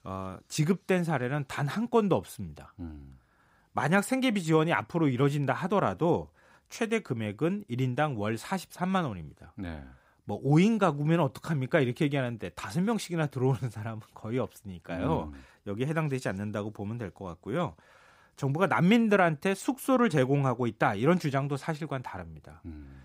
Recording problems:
none

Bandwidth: 15.5 kHz